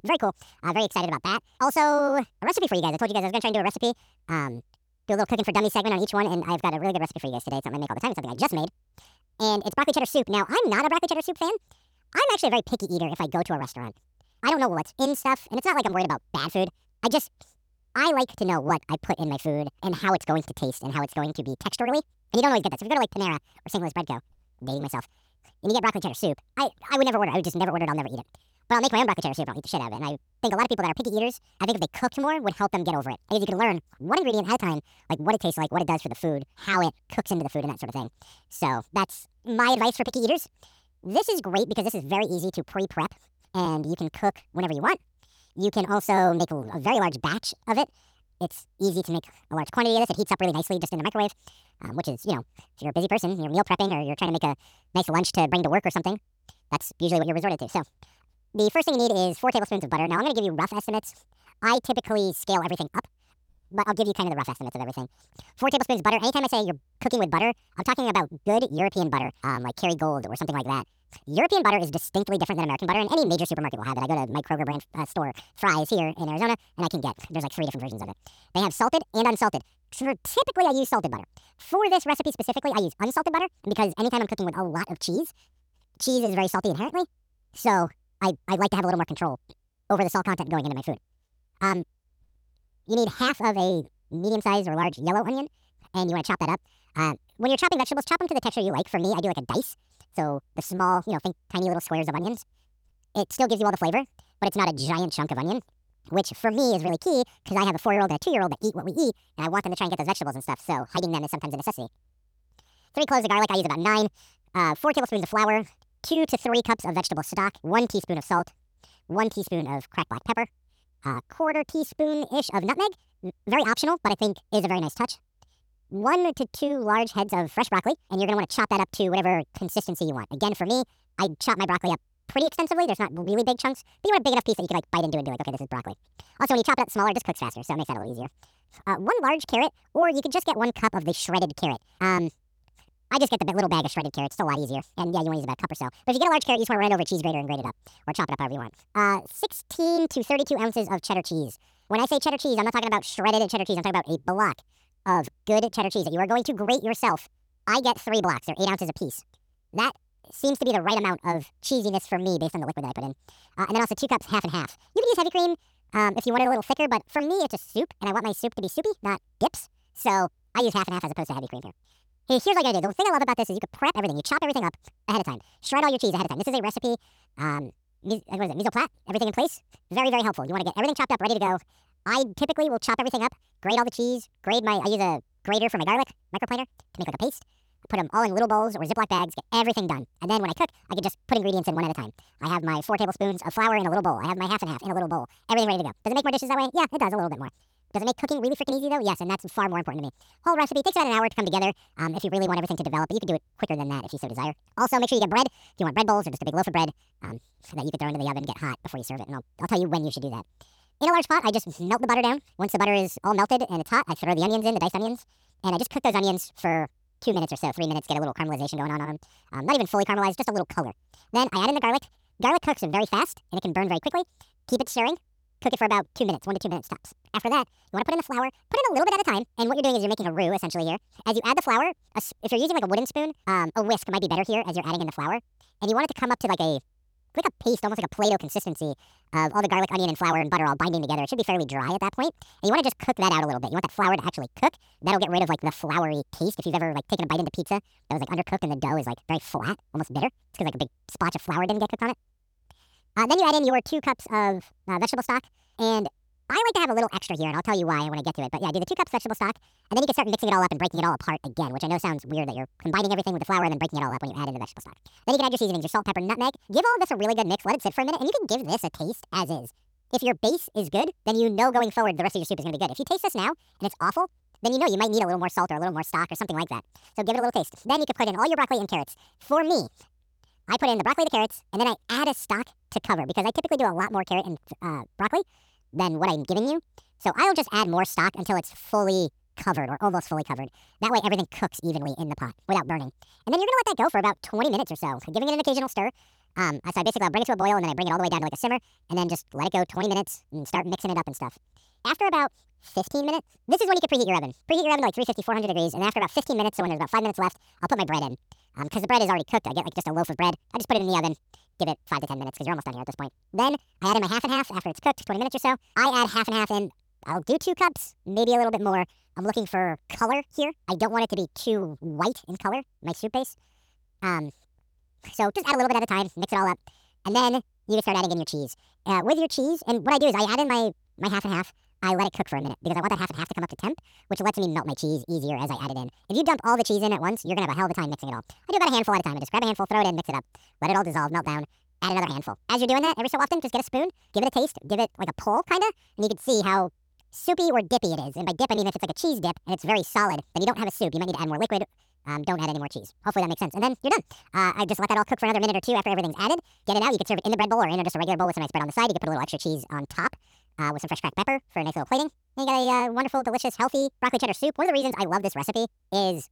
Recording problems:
wrong speed and pitch; too fast and too high; 1.7 times normal speed

